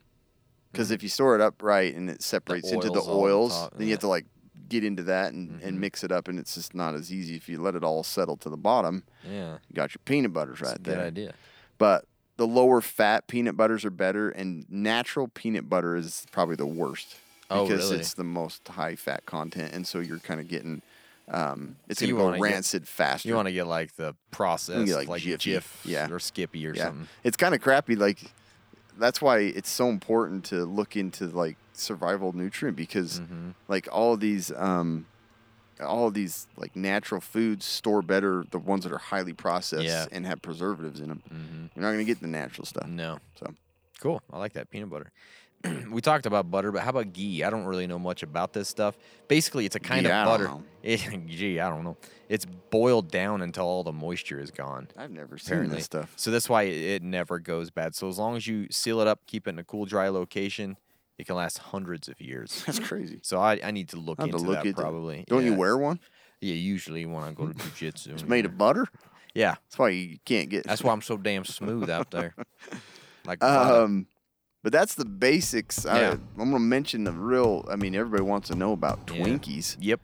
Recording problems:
machinery noise; faint; throughout; 25 dB below the speech

